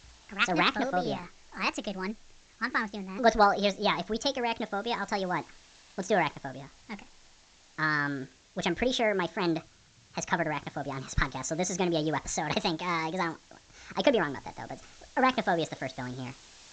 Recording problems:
wrong speed and pitch; too fast and too high; 1.5 times normal speed
high frequencies cut off; noticeable; nothing above 8 kHz
hiss; faint; throughout; 25 dB below the speech

